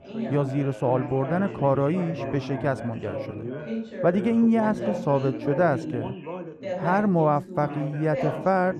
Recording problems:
muffled; slightly; fading above 2 kHz
background chatter; loud; throughout; 3 voices, 8 dB below the speech

